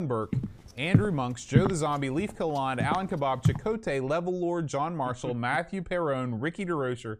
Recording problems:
abrupt cut into speech; at the start
footsteps; loud; until 3.5 s; peak 4 dB above the speech

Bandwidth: 15 kHz